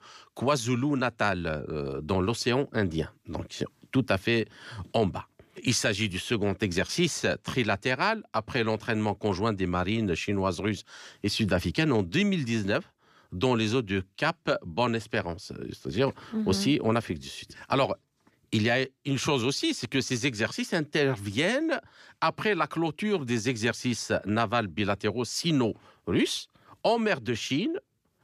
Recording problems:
none

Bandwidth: 15 kHz